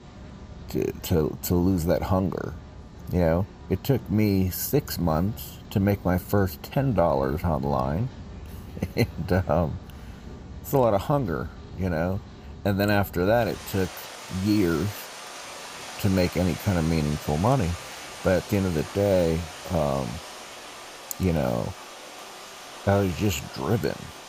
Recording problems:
rain or running water; noticeable; throughout; 15 dB below the speech

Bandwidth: 15 kHz